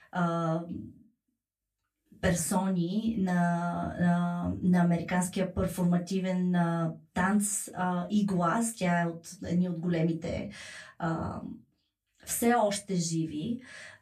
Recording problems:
off-mic speech; far
room echo; very slight; dies away in 0.2 s

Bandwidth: 14.5 kHz